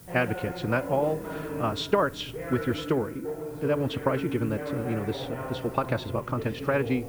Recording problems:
wrong speed, natural pitch; too fast; 1.5 times normal speed
muffled; slightly; fading above 3 kHz
voice in the background; loud; throughout; 7 dB below the speech
hiss; faint; throughout; 20 dB below the speech

